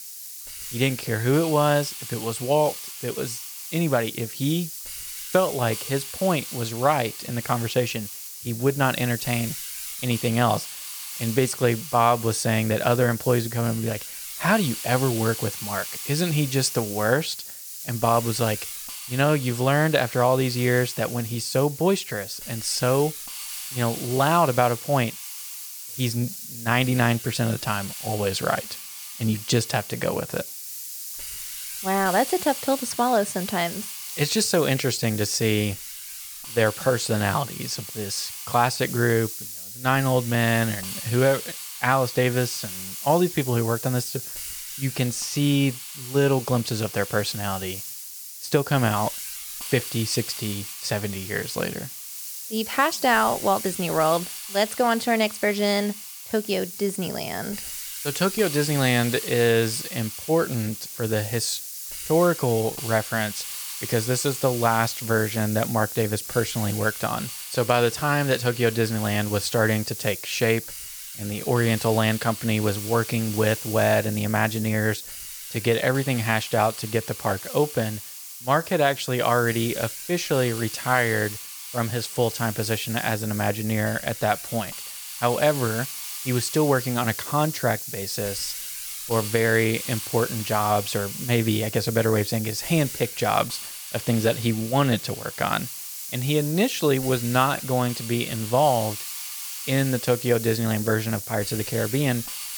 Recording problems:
hiss; loud; throughout; 8 dB below the speech

